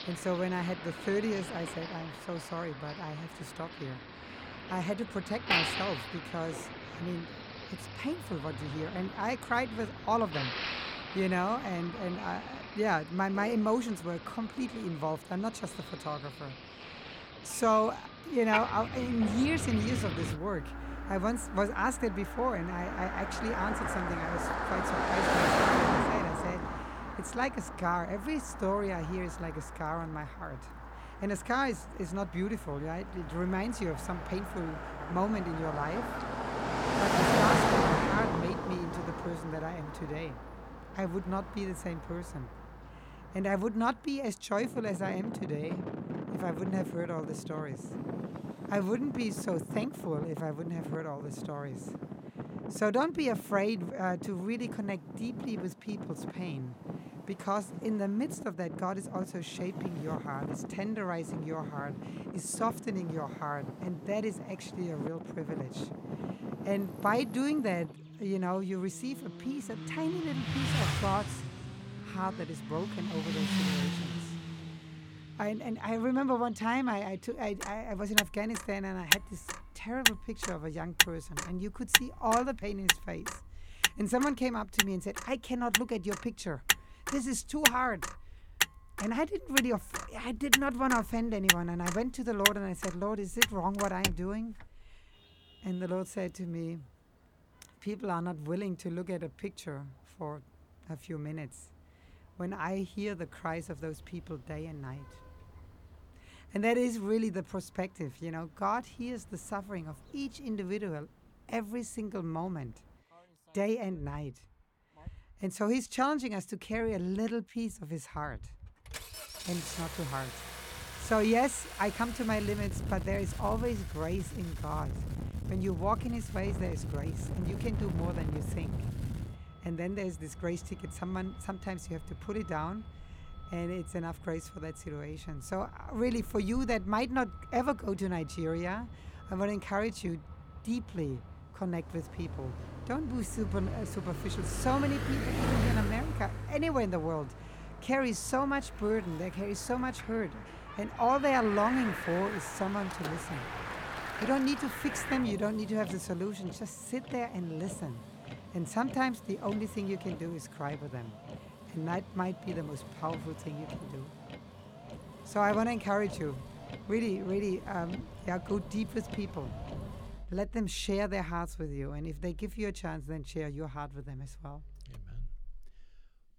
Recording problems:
traffic noise; loud; throughout; 1 dB below the speech

